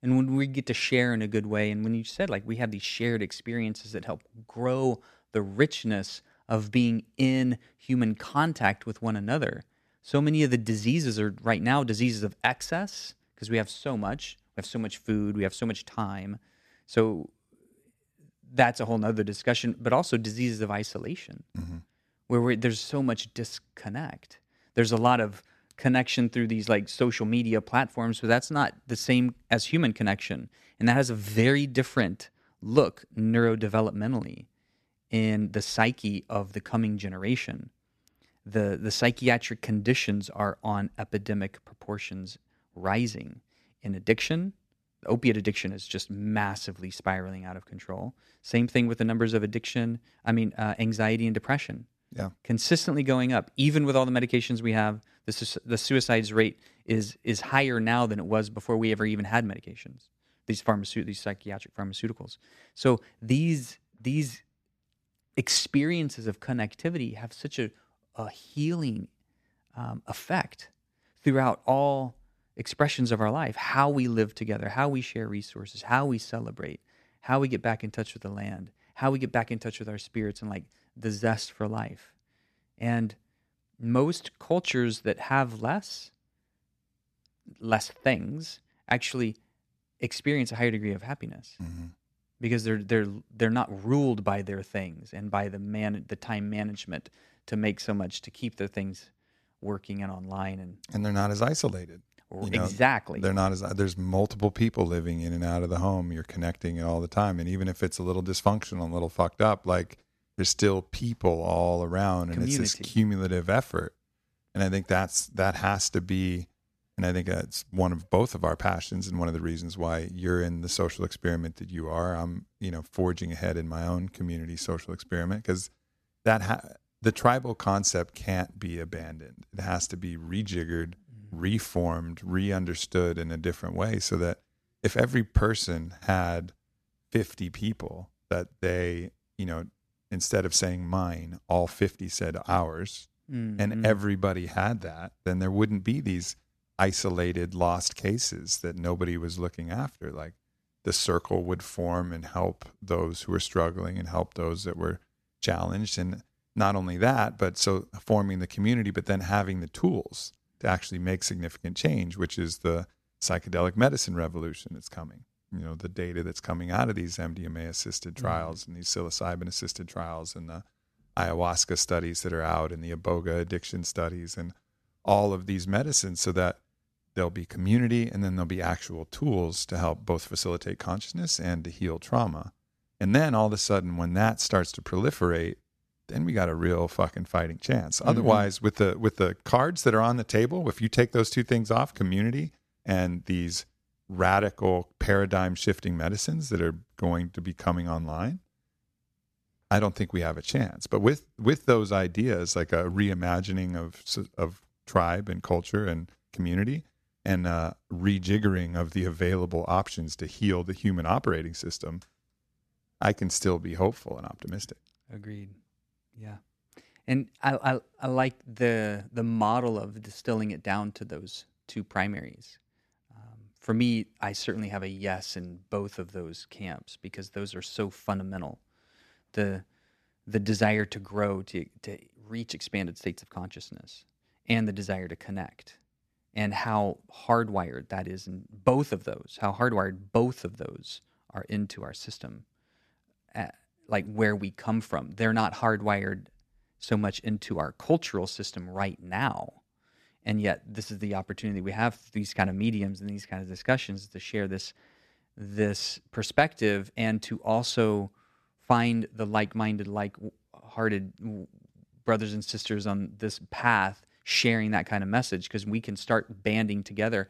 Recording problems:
none

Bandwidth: 14 kHz